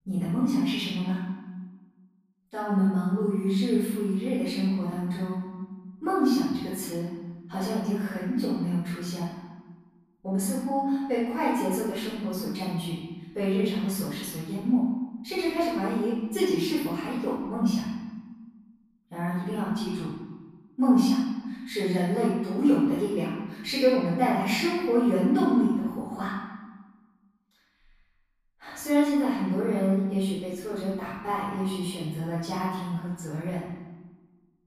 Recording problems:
room echo; strong; dies away in 1.1 s
off-mic speech; far

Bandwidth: 15 kHz